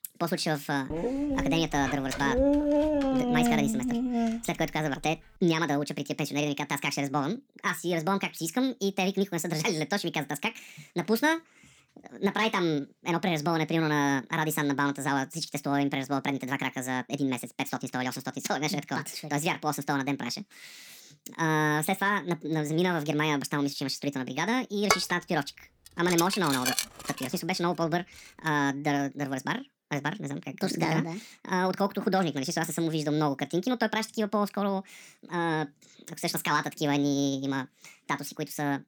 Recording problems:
wrong speed and pitch; too fast and too high; 1.6 times normal speed
dog barking; loud; from 1 to 4.5 s; peak 5 dB above the speech
clattering dishes; loud; from 25 to 27 s; peak 2 dB above the speech

